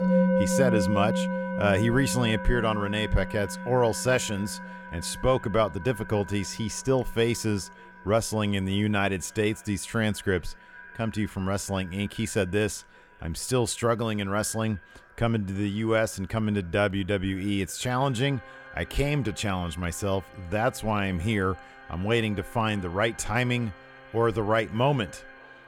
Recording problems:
echo of what is said; faint; throughout; 570 ms later, 25 dB below the speech
background music; loud; throughout; 4 dB below the speech

